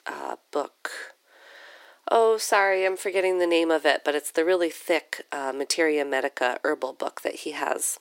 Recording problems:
thin; very; fading below 300 Hz

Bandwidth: 16 kHz